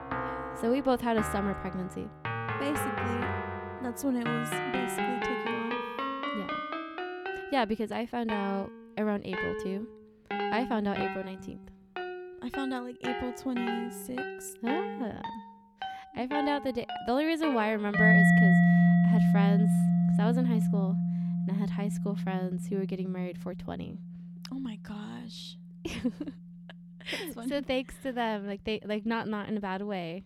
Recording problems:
background music; very loud; throughout; 4 dB above the speech

